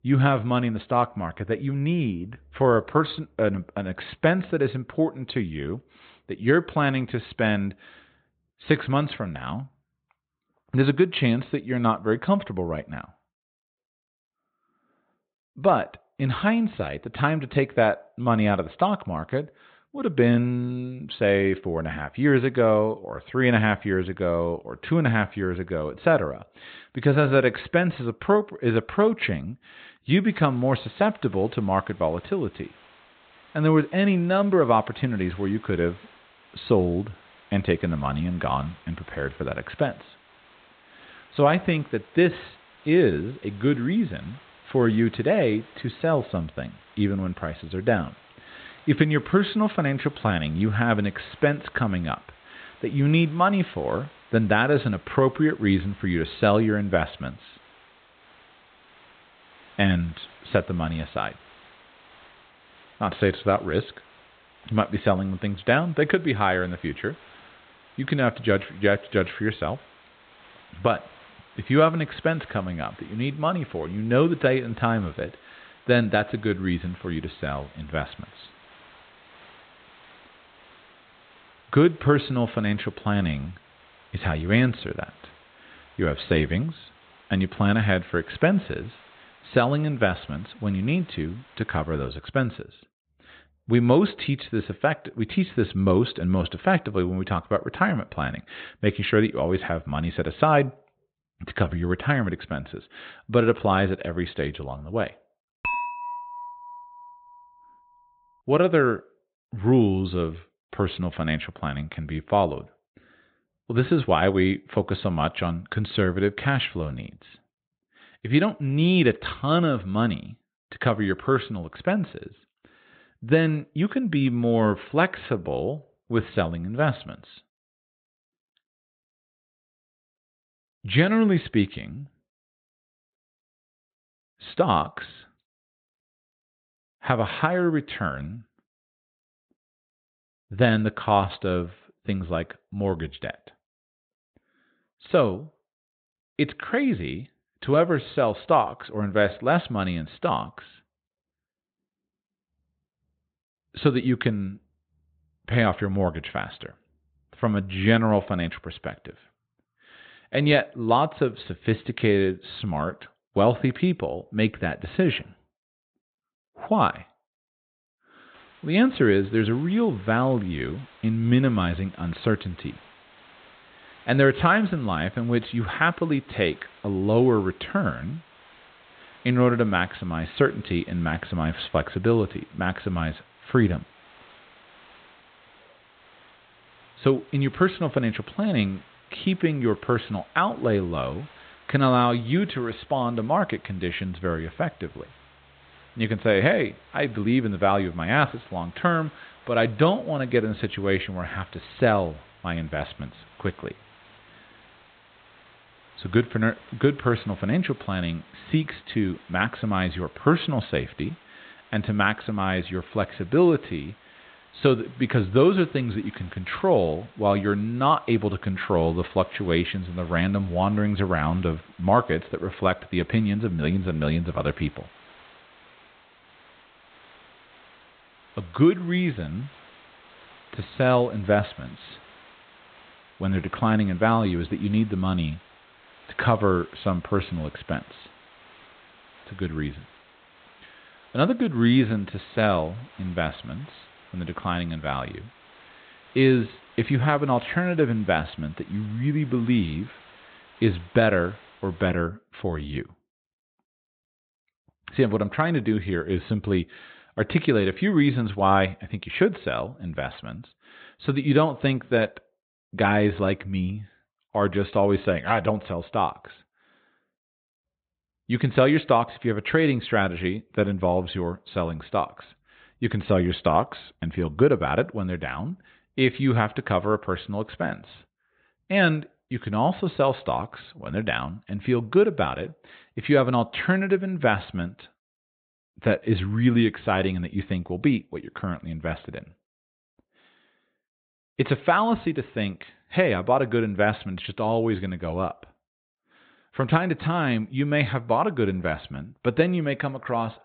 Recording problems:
high frequencies cut off; severe; nothing above 4 kHz
hiss; faint; from 30 s to 1:32 and from 2:48 to 4:12; 25 dB below the speech
clattering dishes; noticeable; from 1:46 to 1:47; peak 3 dB below the speech

